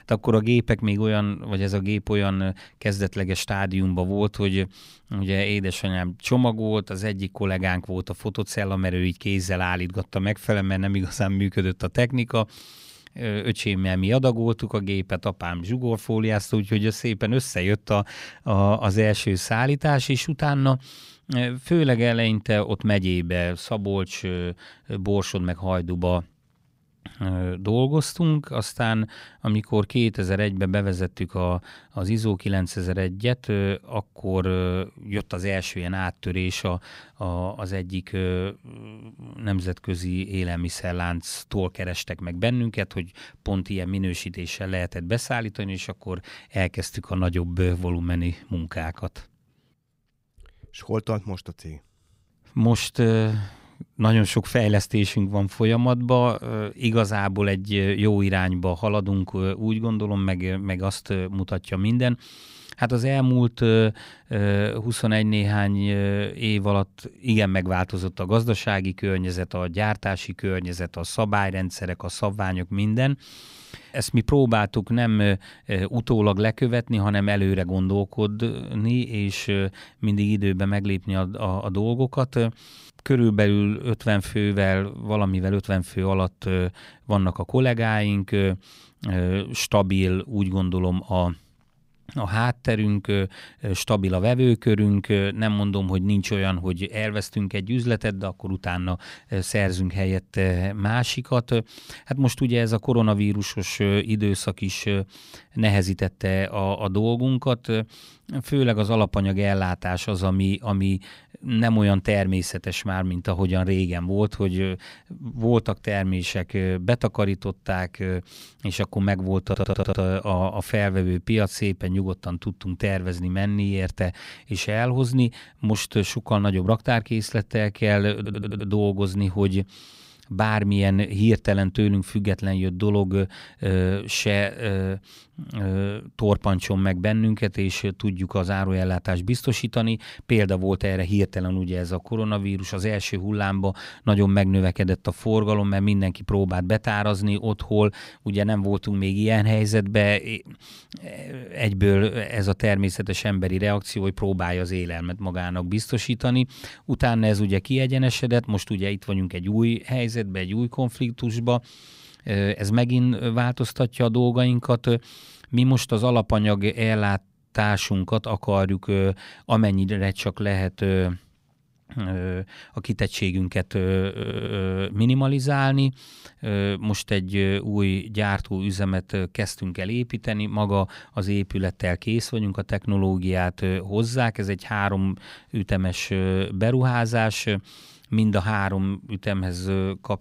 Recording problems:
audio stuttering; at 1:59, at 2:08 and at 2:54

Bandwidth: 15.5 kHz